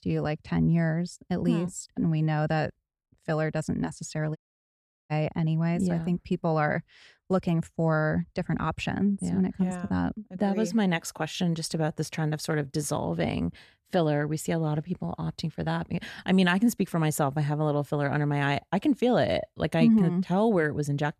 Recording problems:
audio cutting out; at 4.5 s for 0.5 s

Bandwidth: 14 kHz